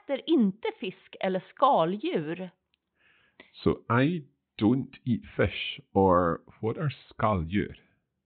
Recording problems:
high frequencies cut off; severe; nothing above 4 kHz

